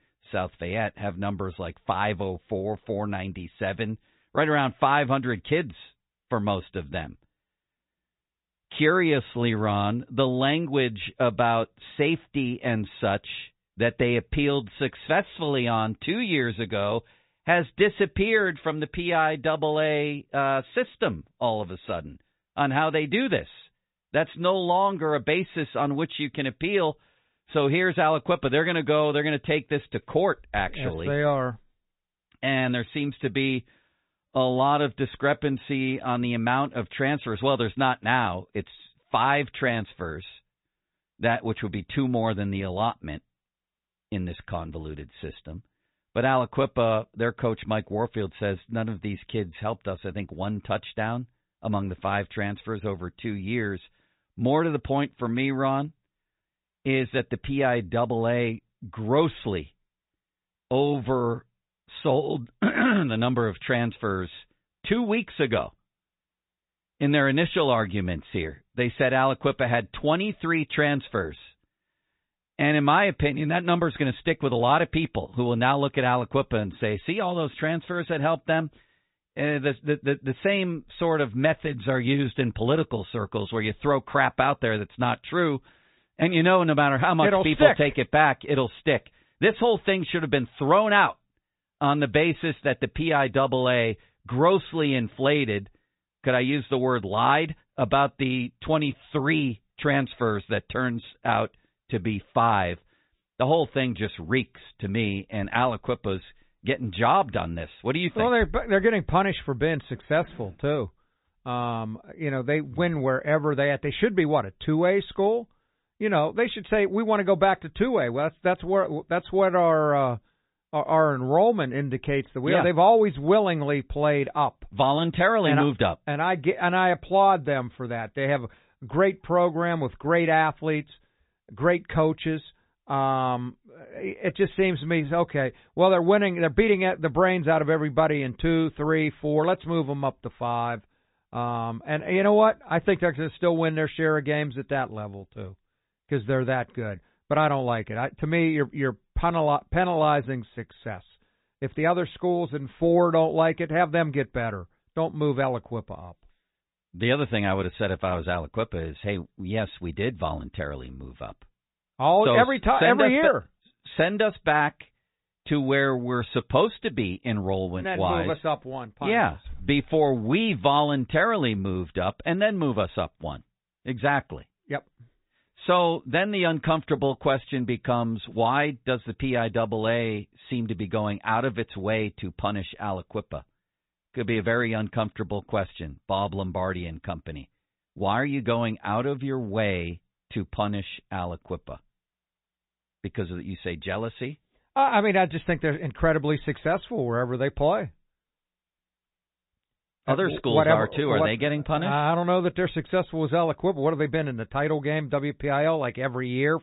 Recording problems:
high frequencies cut off; severe; nothing above 4 kHz
garbled, watery; slightly

